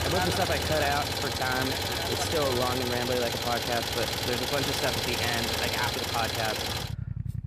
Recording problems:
traffic noise; very loud; throughout; 3 dB above the speech

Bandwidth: 14.5 kHz